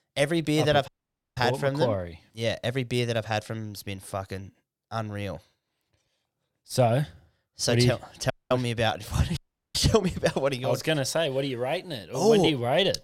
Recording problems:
audio cutting out; at 1 s, at 8.5 s and at 9.5 s

